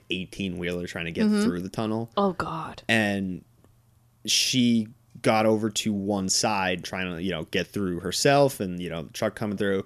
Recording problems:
none

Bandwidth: 14.5 kHz